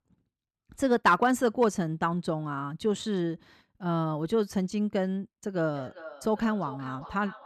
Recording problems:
echo of what is said; noticeable; from 5.5 s on; 400 ms later, 15 dB below the speech

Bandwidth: 13.5 kHz